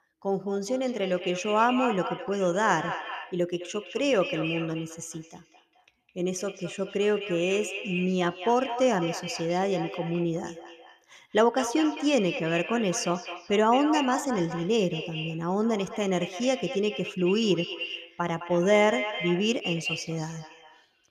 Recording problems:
echo of what is said; strong; throughout; 210 ms later, 9 dB below the speech

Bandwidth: 14.5 kHz